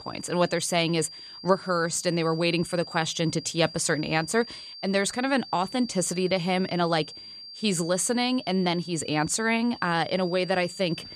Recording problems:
high-pitched whine; noticeable; throughout; 4.5 kHz, 15 dB below the speech

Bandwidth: 13.5 kHz